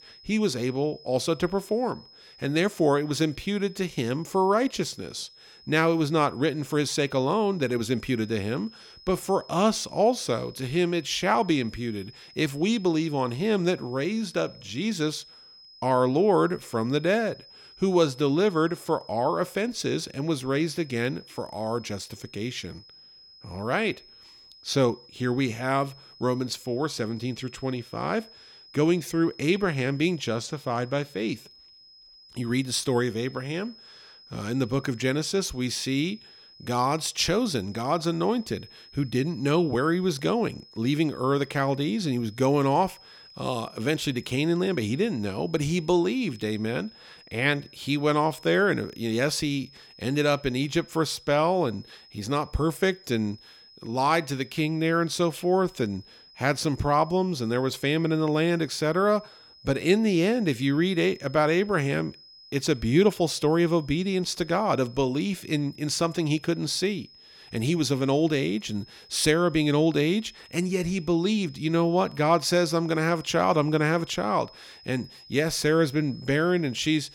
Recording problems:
high-pitched whine; faint; throughout; 5 kHz, 25 dB below the speech

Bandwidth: 17 kHz